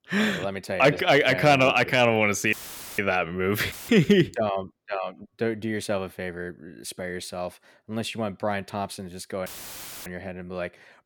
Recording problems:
audio cutting out; filled with static; at 2.5 s, at 3.5 s and at 9.5 s for 0.5 s

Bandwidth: 18.5 kHz